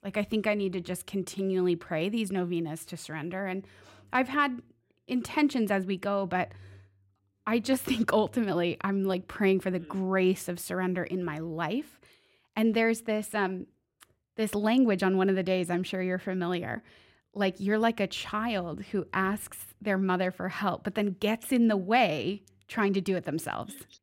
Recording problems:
none

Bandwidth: 16 kHz